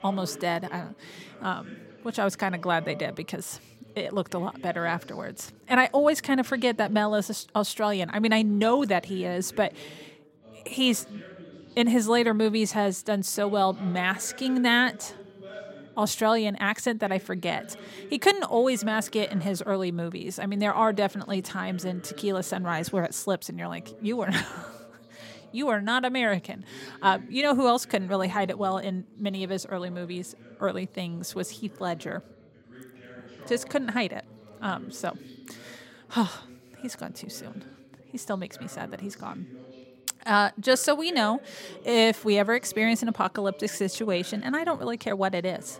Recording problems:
background chatter; faint; throughout; 3 voices, 20 dB below the speech

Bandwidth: 16 kHz